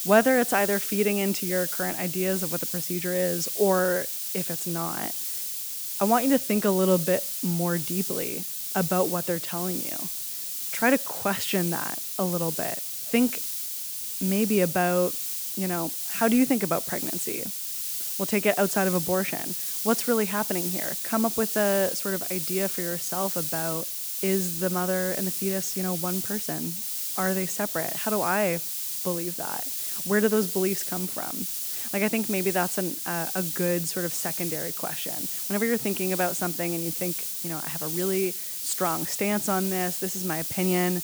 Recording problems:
hiss; loud; throughout; 1 dB below the speech

